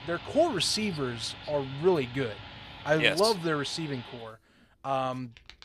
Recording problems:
household noises; noticeable; throughout; 15 dB below the speech

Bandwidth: 15 kHz